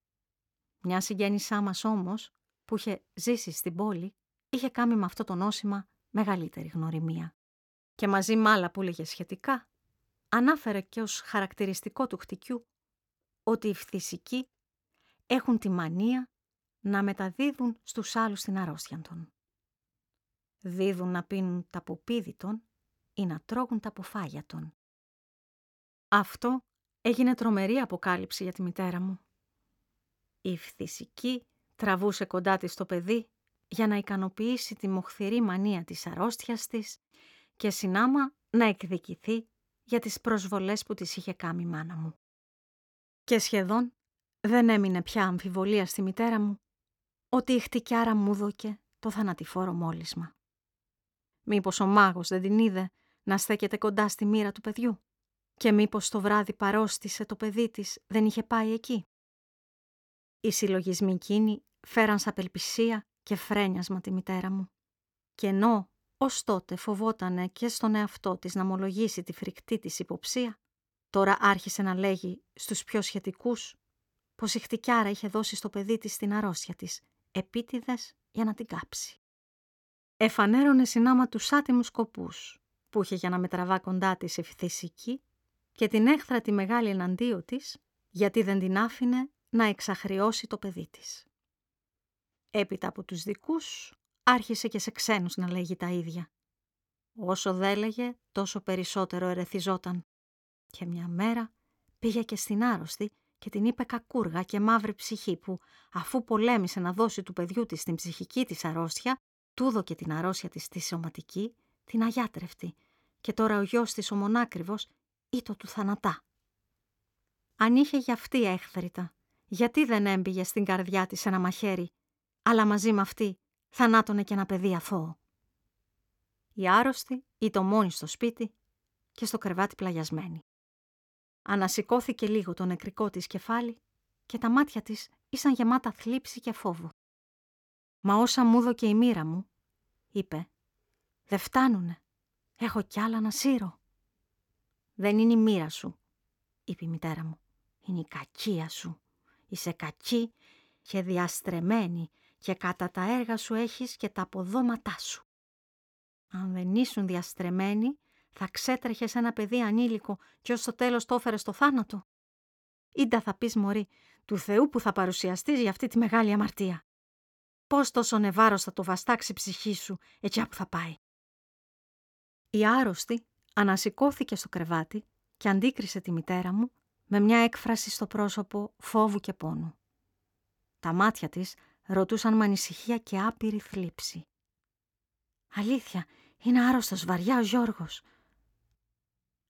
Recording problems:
none

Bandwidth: 17.5 kHz